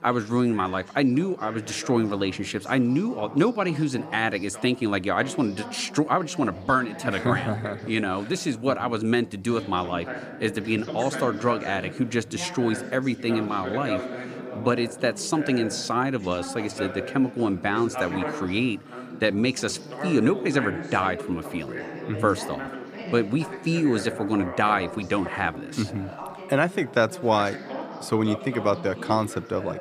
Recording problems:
background chatter; noticeable; throughout; 2 voices, 10 dB below the speech

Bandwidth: 15 kHz